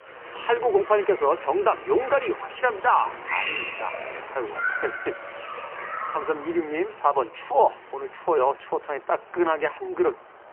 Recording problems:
phone-call audio; poor line; nothing above 3 kHz
crowd noise; loud; throughout; 8 dB below the speech
traffic noise; faint; throughout; 25 dB below the speech

